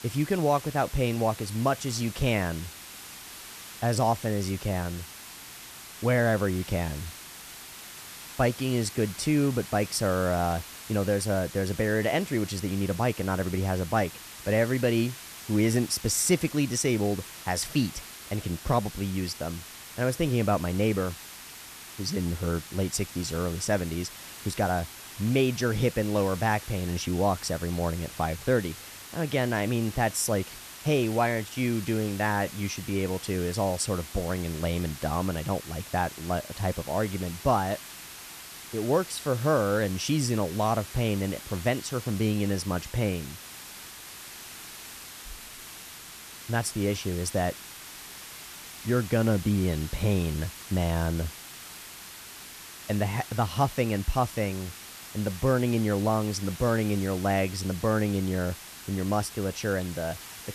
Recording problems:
hiss; noticeable; throughout; 15 dB below the speech

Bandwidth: 14 kHz